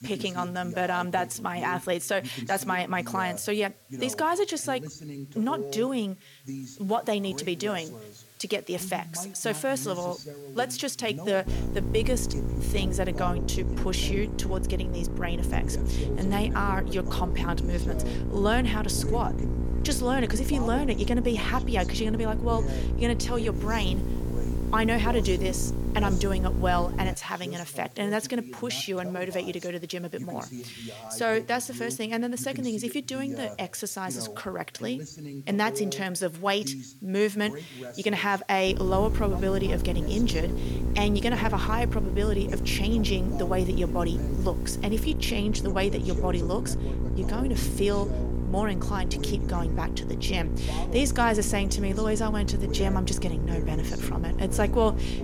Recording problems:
electrical hum; loud; from 11 to 27 s and from 39 s on; 60 Hz, 10 dB below the speech
voice in the background; noticeable; throughout; 10 dB below the speech
hiss; faint; until 13 s and from 24 to 45 s; 25 dB below the speech

